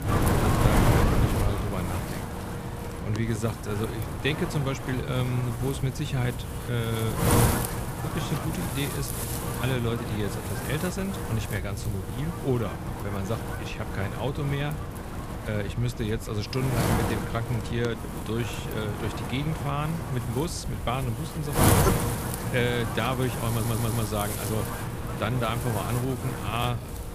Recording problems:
wind noise on the microphone; heavy; as loud as the speech
electrical hum; faint; throughout; 60 Hz, 25 dB below the speech
audio stuttering; at 24 s

